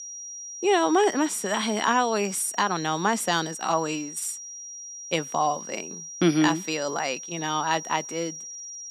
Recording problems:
high-pitched whine; noticeable; throughout; 5.5 kHz, 10 dB below the speech

